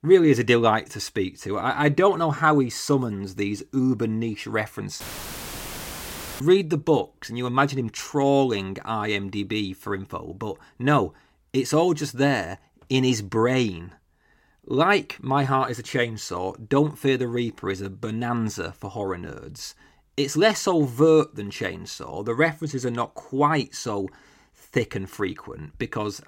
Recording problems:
audio cutting out; filled with static; at 5 s for 1.5 s

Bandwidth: 16.5 kHz